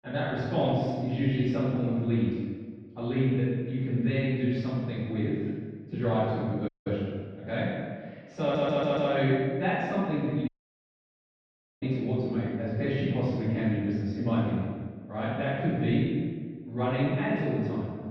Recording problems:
room echo; strong; dies away in 1.3 s
off-mic speech; far
muffled; very; fading above 2.5 kHz
audio cutting out; at 6.5 s and at 10 s for 1.5 s
audio stuttering; at 8.5 s

